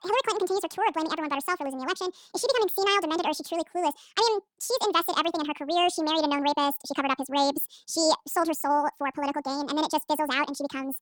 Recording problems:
wrong speed and pitch; too fast and too high; 1.7 times normal speed

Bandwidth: 19 kHz